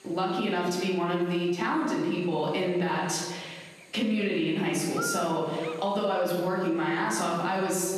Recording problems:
off-mic speech; far
room echo; noticeable; dies away in 1.1 s
squashed, flat; somewhat
electrical hum; loud; throughout; 60 Hz, 9 dB below the speech

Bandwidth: 13.5 kHz